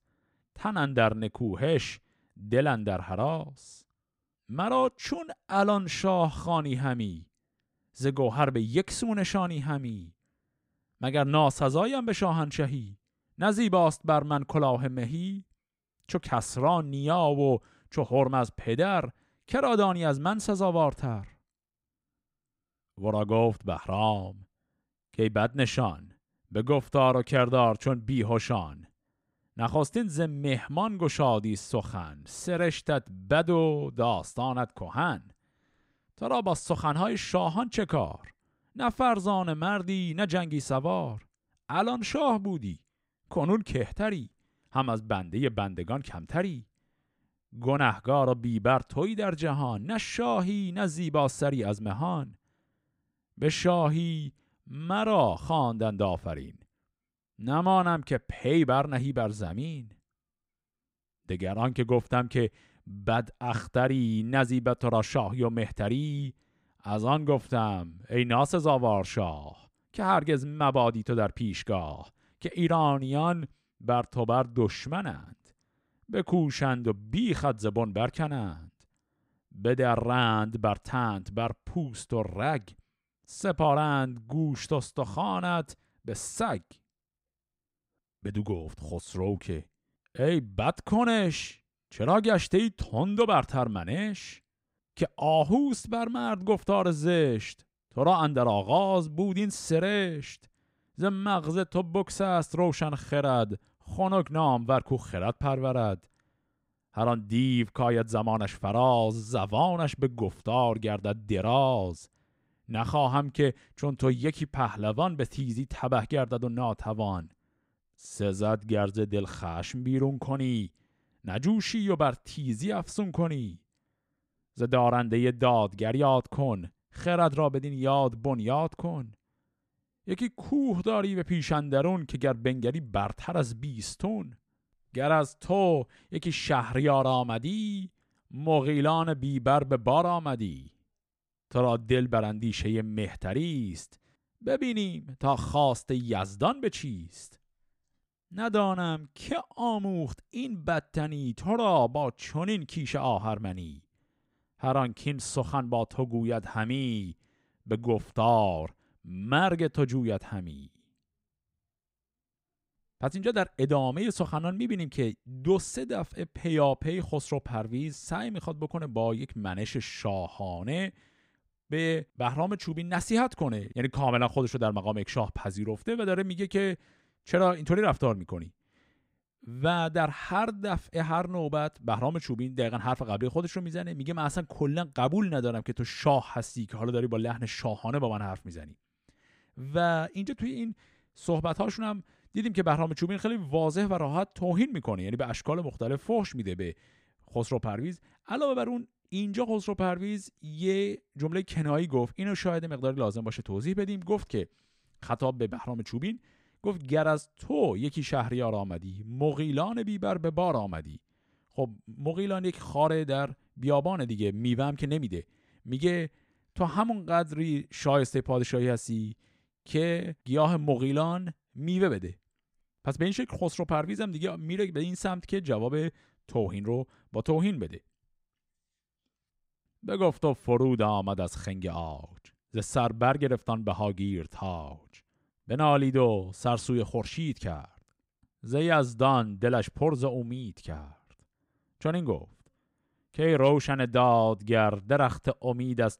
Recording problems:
none

